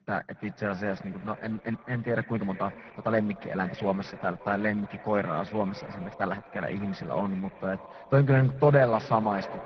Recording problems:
garbled, watery; badly
muffled; very; fading above 1.5 kHz
echo of what is said; noticeable; throughout; 260 ms later, 15 dB below the speech
uneven, jittery; strongly; from 0.5 to 9 s

